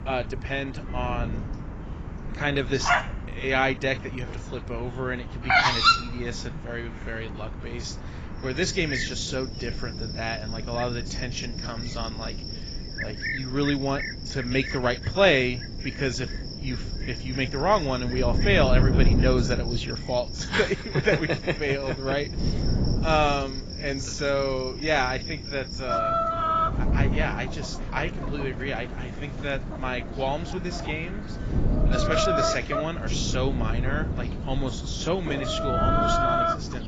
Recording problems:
garbled, watery; badly; nothing above 7.5 kHz
animal sounds; loud; throughout; 2 dB below the speech
wind noise on the microphone; occasional gusts; 15 dB below the speech

